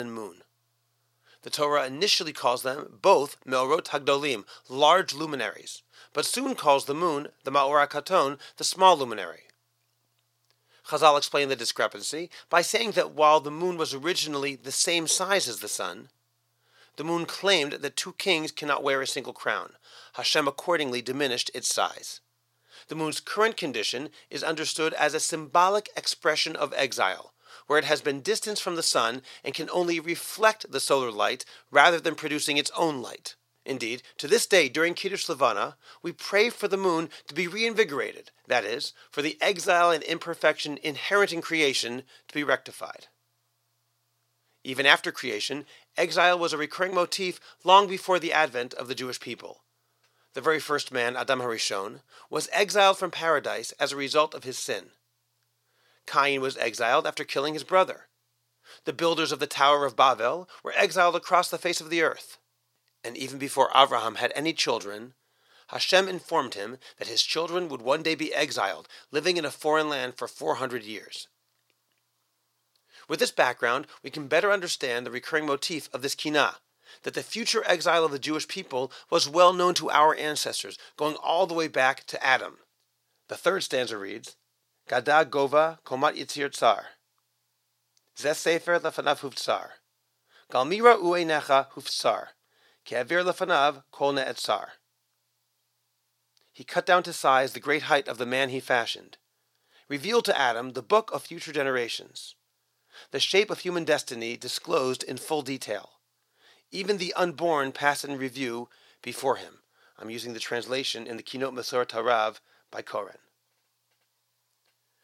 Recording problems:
thin; somewhat; fading below 500 Hz
abrupt cut into speech; at the start

